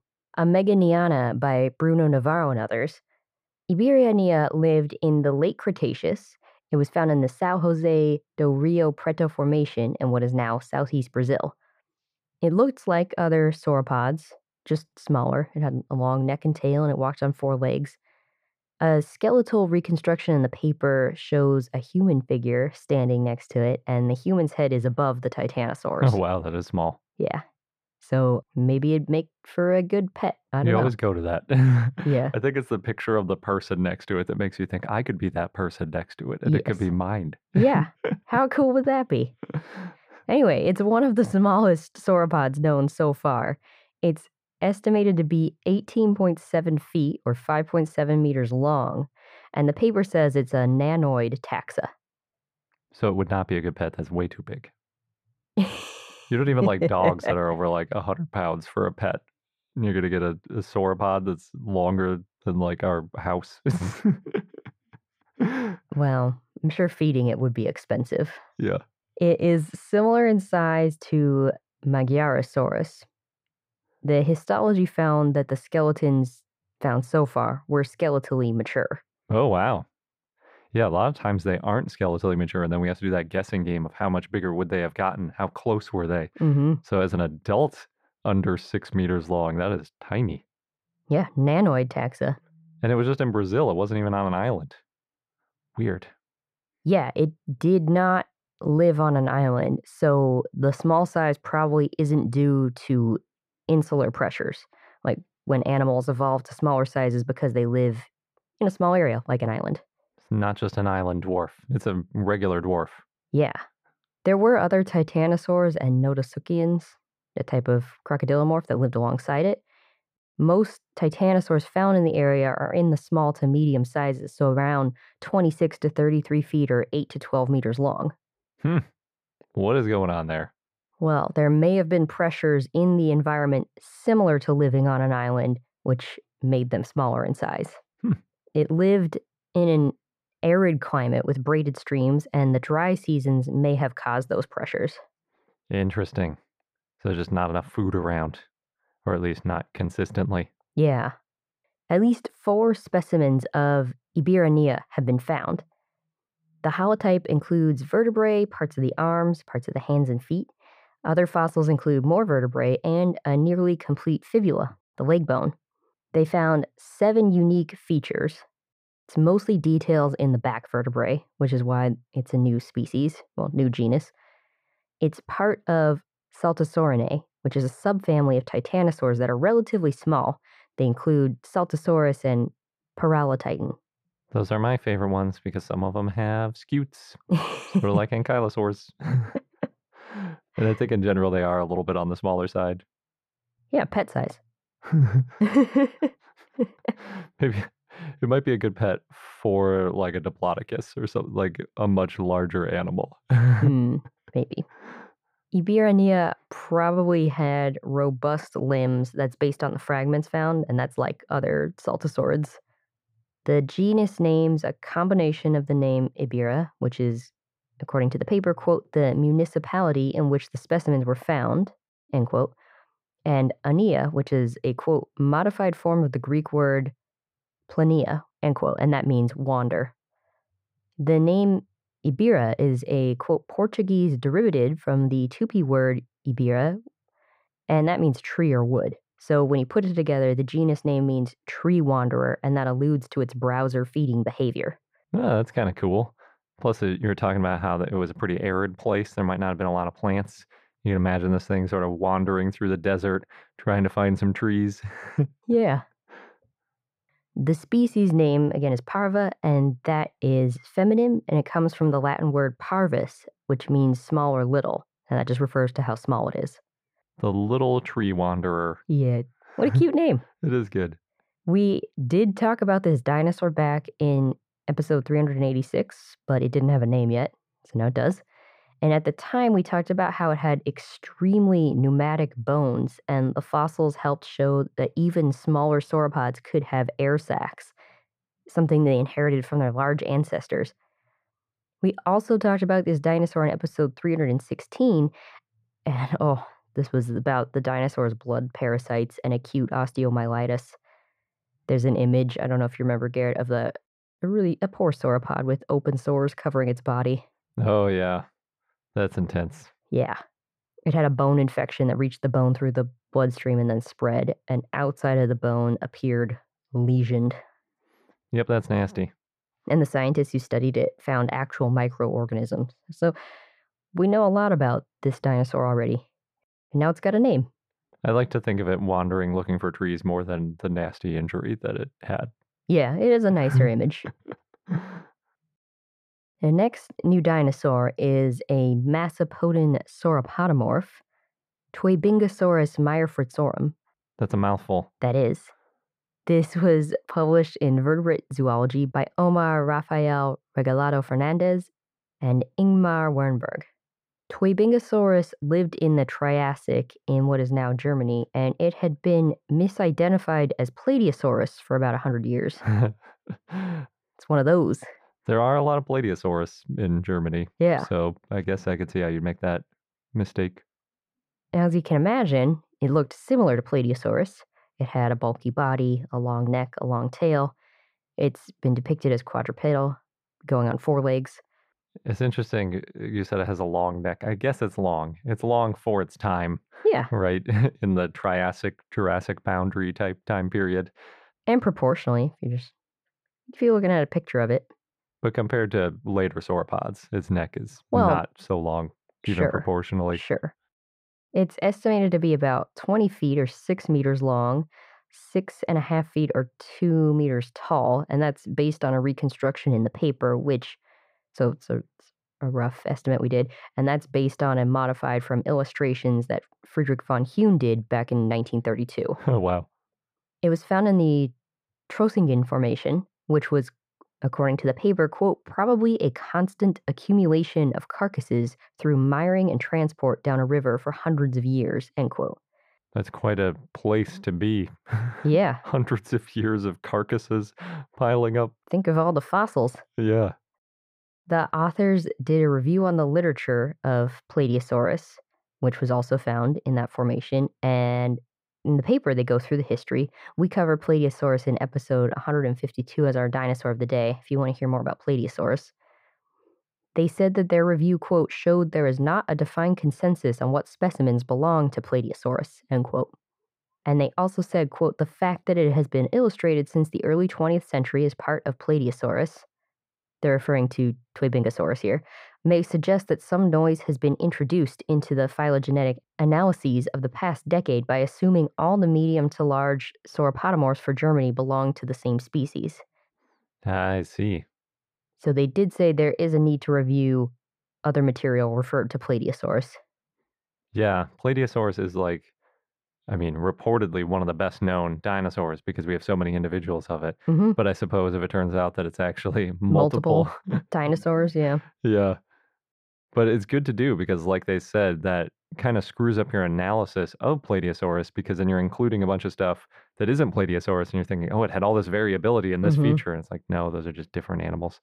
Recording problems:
muffled; very; fading above 3 kHz

